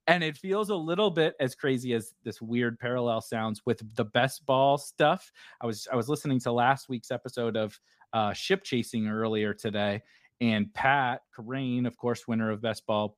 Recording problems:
none

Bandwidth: 15 kHz